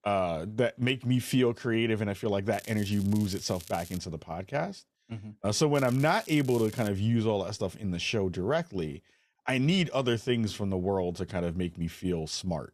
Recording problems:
crackling; noticeable; from 2.5 to 4 s and from 6 to 7 s; 15 dB below the speech

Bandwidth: 14 kHz